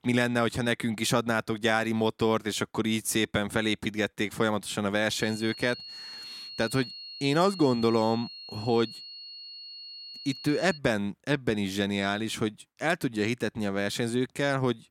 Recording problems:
high-pitched whine; noticeable; from 5 to 11 s; 4.5 kHz, 10 dB below the speech

